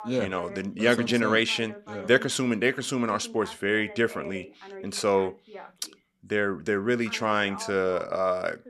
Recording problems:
voice in the background; noticeable; throughout; 20 dB below the speech

